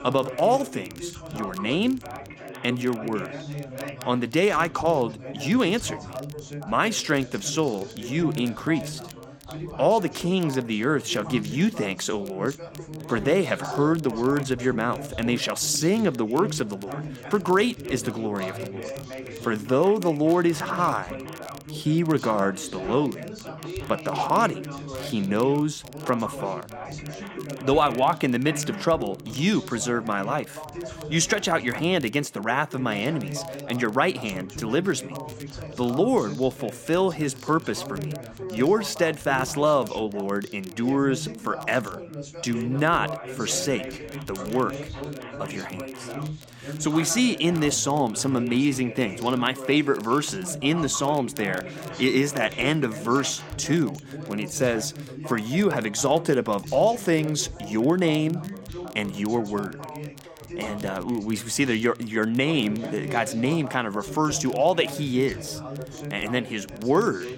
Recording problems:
background chatter; noticeable; throughout; 3 voices, 10 dB below the speech
crackle, like an old record; faint; 25 dB below the speech

